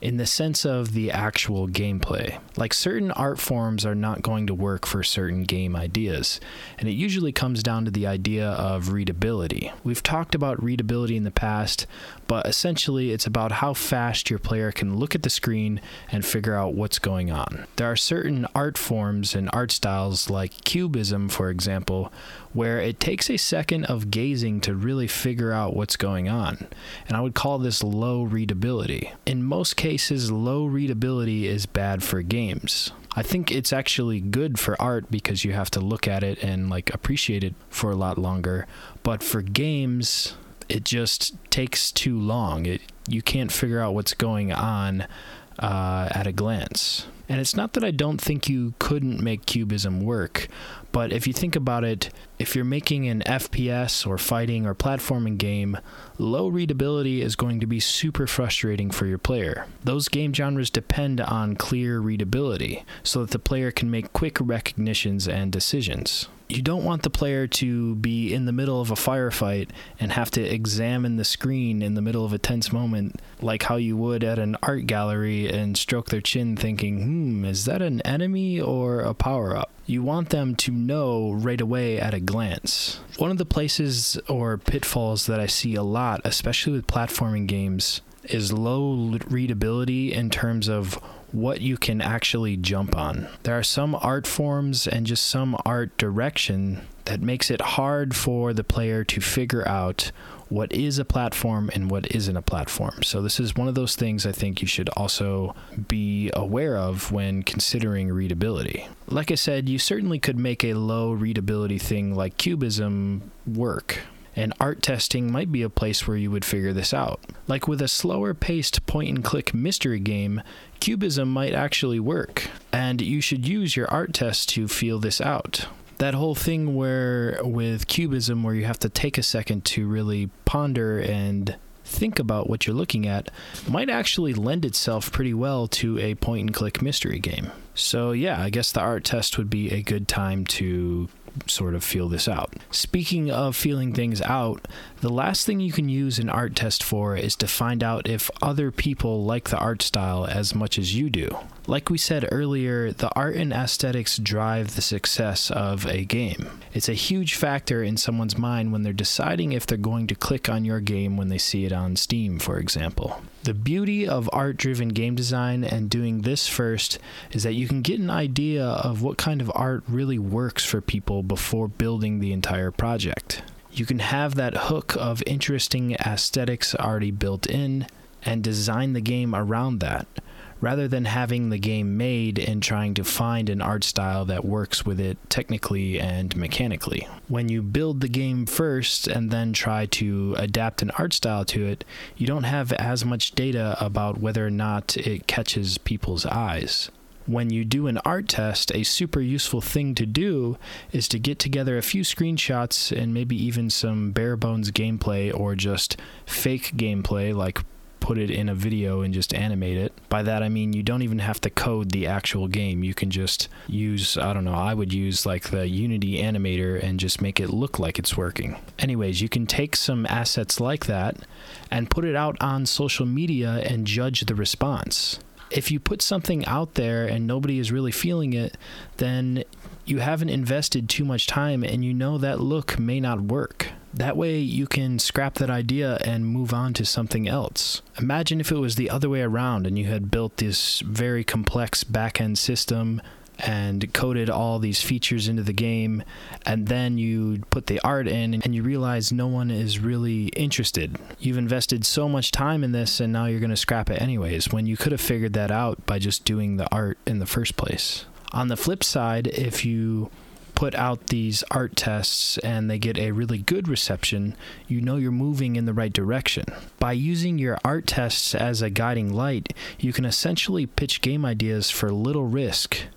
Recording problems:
squashed, flat; heavily

